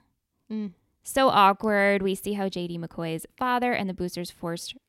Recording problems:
none

